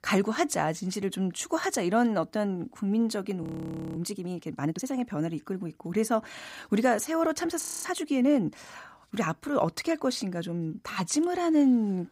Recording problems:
audio freezing; at 3.5 s for 0.5 s and at 7.5 s

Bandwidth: 15.5 kHz